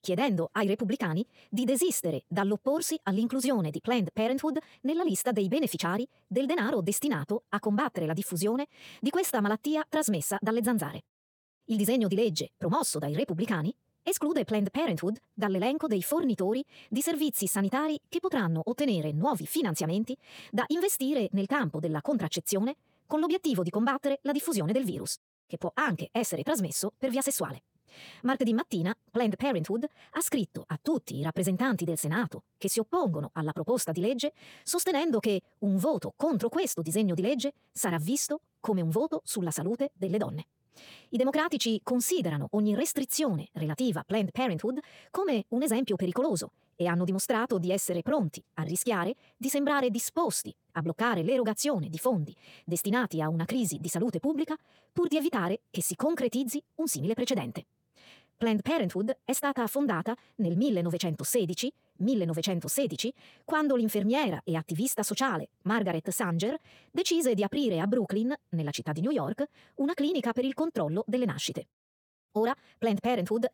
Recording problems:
wrong speed, natural pitch; too fast; 1.8 times normal speed

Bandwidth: 18 kHz